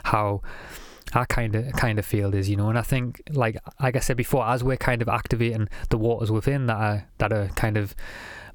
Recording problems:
squashed, flat; heavily

